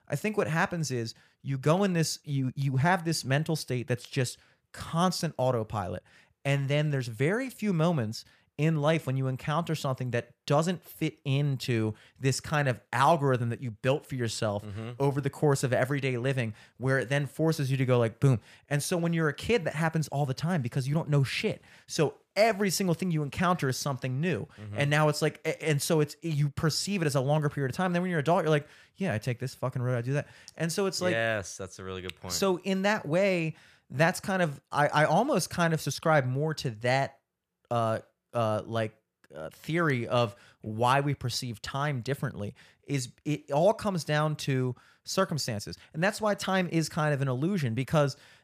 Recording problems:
none

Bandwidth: 14.5 kHz